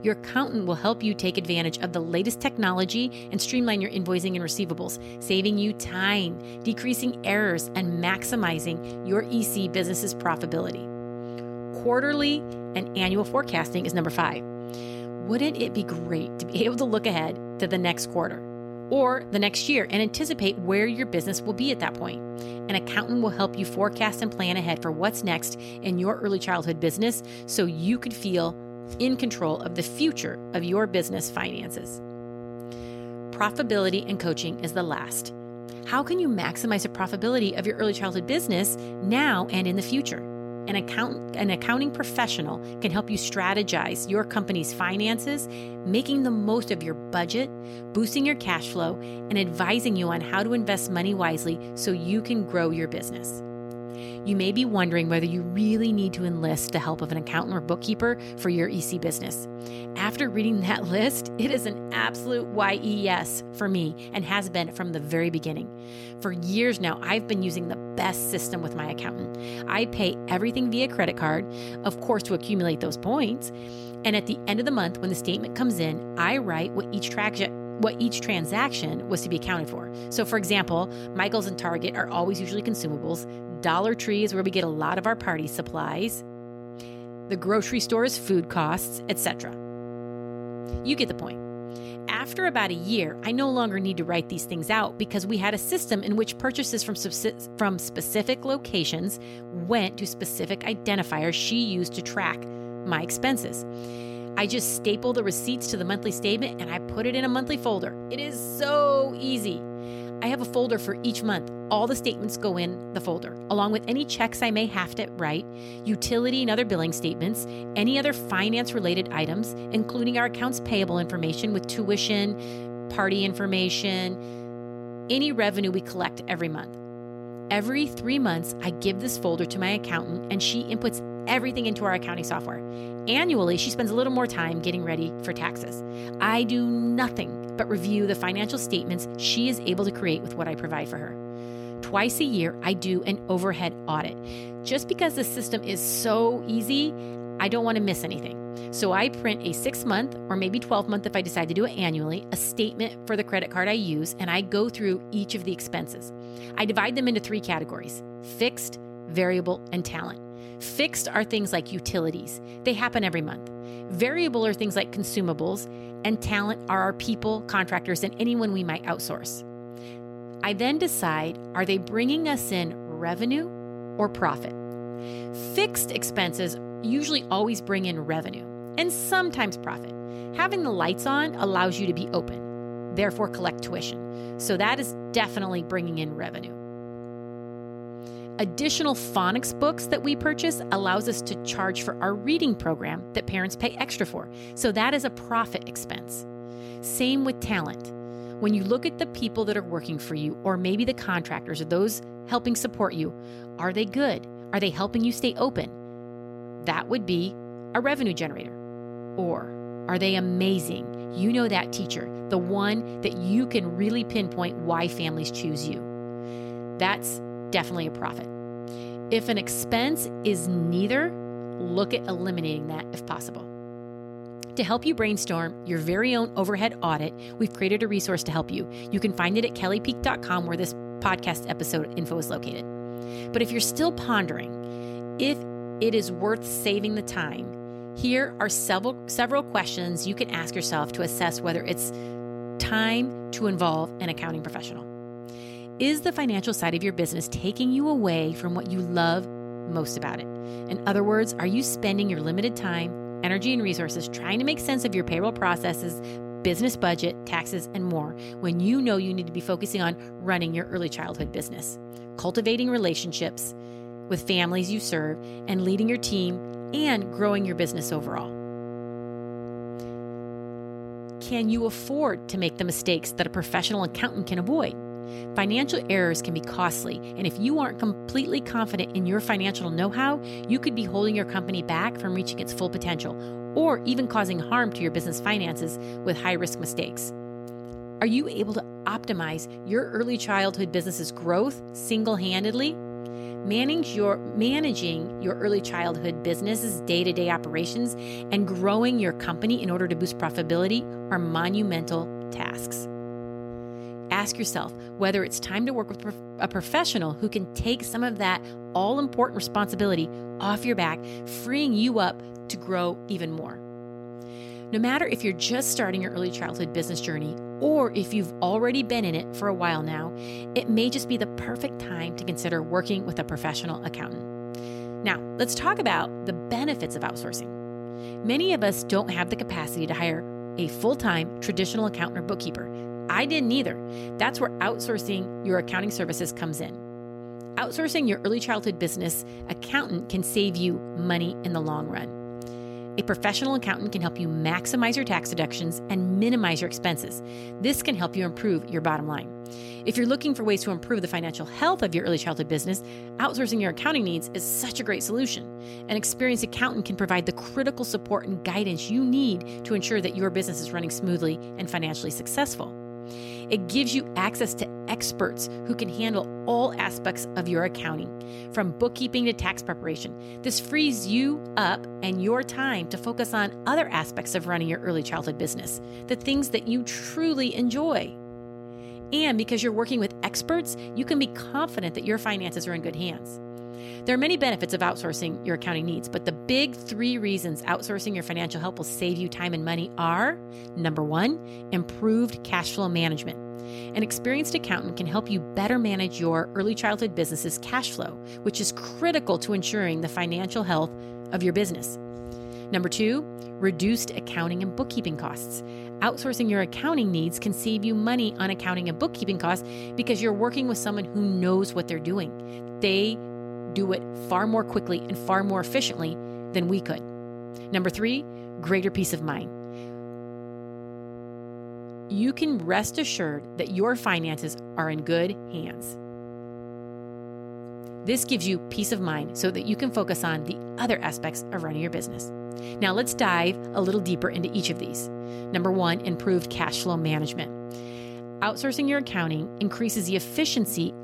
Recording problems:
electrical hum; noticeable; throughout; 60 Hz, 10 dB below the speech

